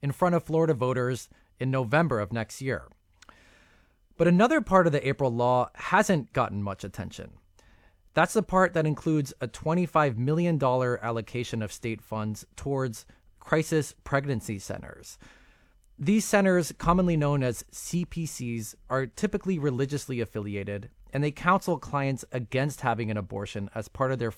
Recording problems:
none

